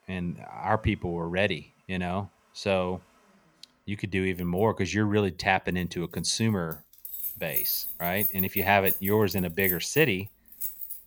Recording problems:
household noises; loud; throughout; 2 dB below the speech

